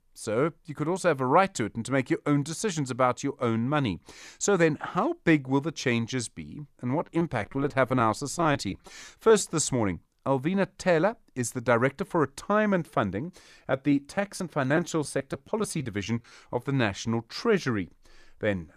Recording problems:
choppy; very; from 7 to 9.5 s and from 14 to 16 s; 11% of the speech affected

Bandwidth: 14.5 kHz